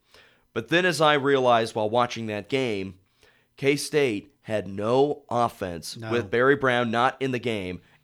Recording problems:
none

